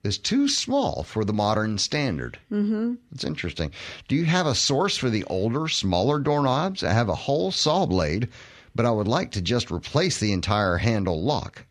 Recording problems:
none

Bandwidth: 14.5 kHz